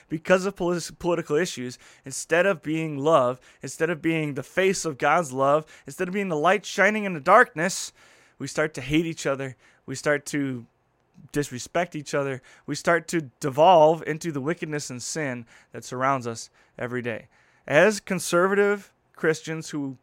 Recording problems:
none

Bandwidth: 16 kHz